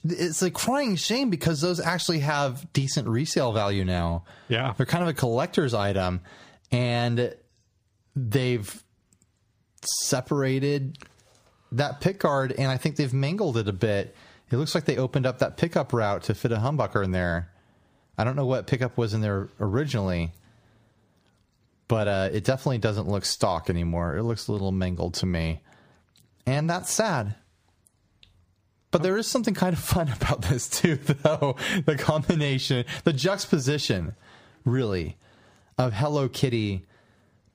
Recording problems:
squashed, flat; somewhat

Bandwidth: 15 kHz